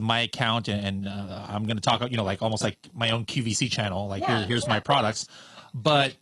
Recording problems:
garbled, watery; slightly
abrupt cut into speech; at the start

